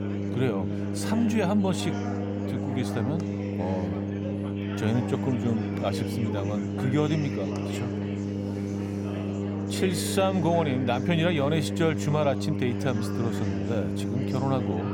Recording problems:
electrical hum; loud; throughout; 50 Hz, 6 dB below the speech
chatter from many people; loud; throughout; 10 dB below the speech

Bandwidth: 18 kHz